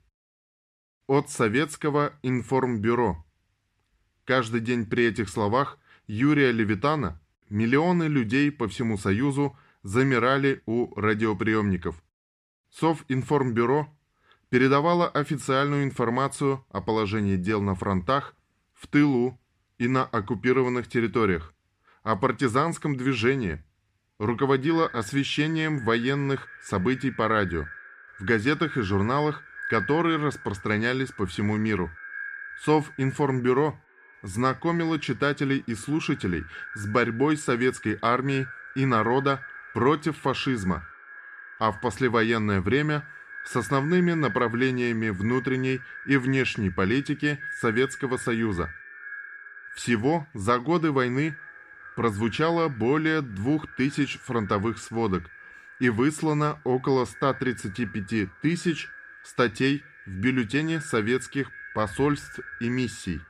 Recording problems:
echo of what is said; noticeable; from 25 s on; 420 ms later, 15 dB below the speech

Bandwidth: 14.5 kHz